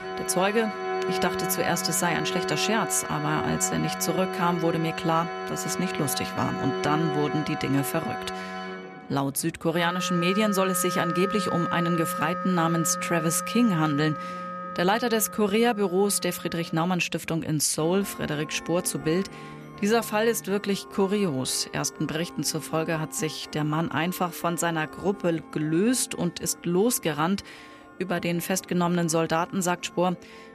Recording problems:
background music; loud; throughout; 7 dB below the speech
background chatter; faint; throughout; 4 voices, 25 dB below the speech

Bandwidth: 14.5 kHz